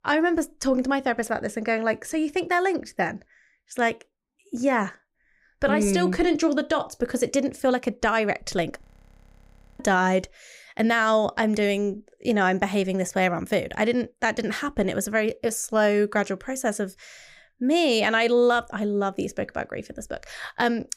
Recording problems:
audio freezing; at 9 s for 1 s

